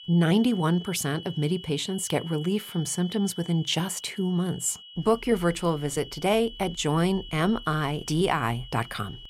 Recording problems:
high-pitched whine; noticeable; throughout; 3 kHz, 15 dB below the speech

